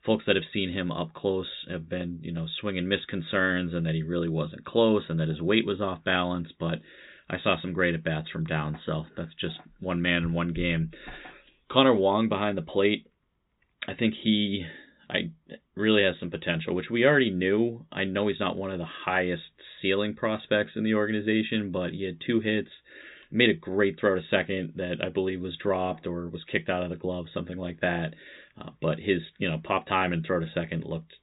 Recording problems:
high frequencies cut off; severe; nothing above 4 kHz

